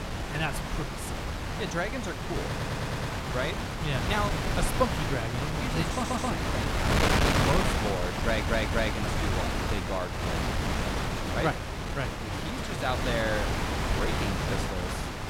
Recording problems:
wind noise on the microphone; heavy; 2 dB above the speech
audio stuttering; at 2.5 s, at 6 s and at 8 s

